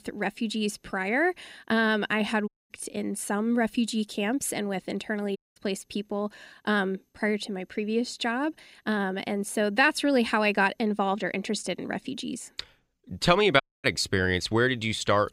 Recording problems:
audio cutting out; at 2.5 s, at 5.5 s and at 14 s

